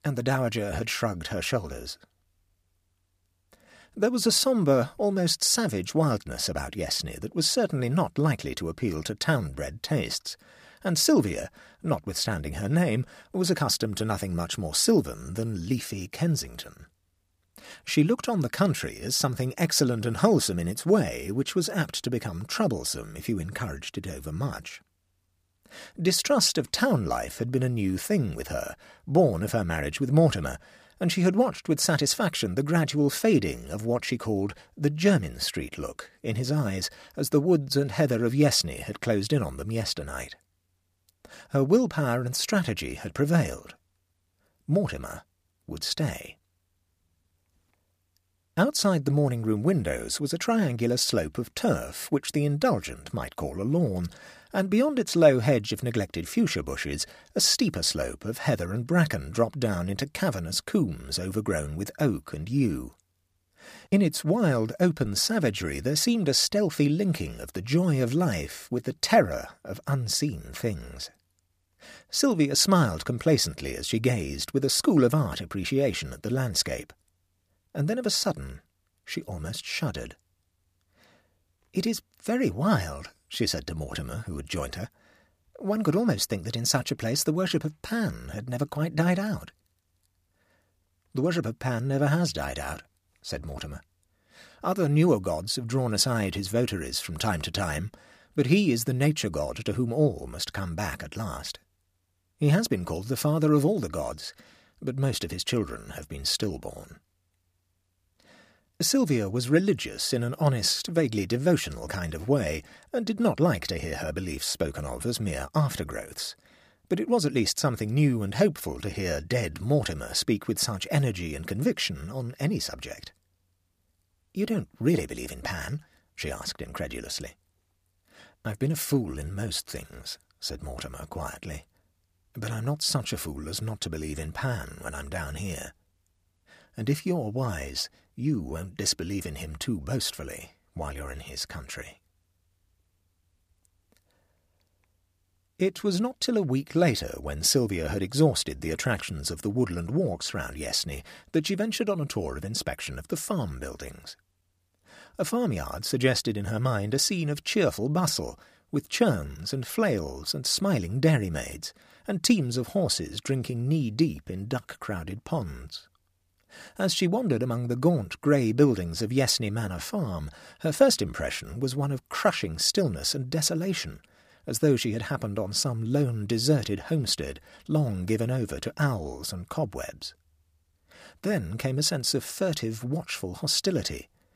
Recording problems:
none

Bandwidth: 15 kHz